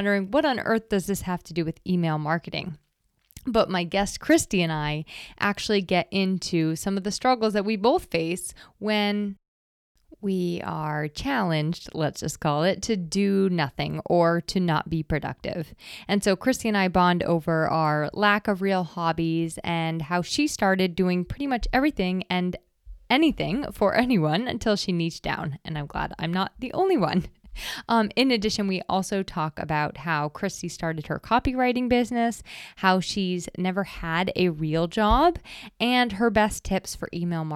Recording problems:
abrupt cut into speech; at the start and the end

